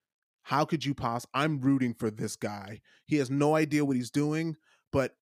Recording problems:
none

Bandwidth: 15 kHz